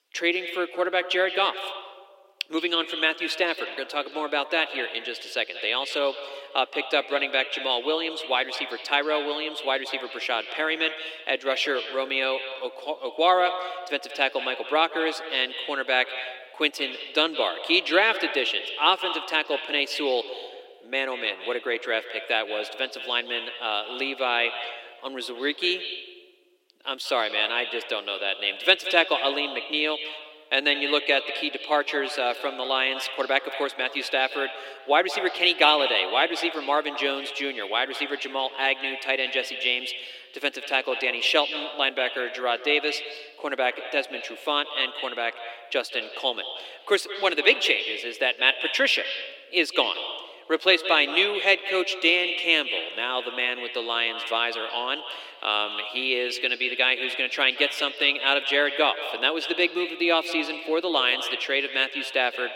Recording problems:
echo of what is said; strong; throughout; 170 ms later, 9 dB below the speech
thin; somewhat; fading below 300 Hz

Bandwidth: 16 kHz